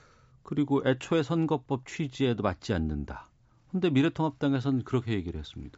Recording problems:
high frequencies cut off; noticeable; nothing above 8 kHz

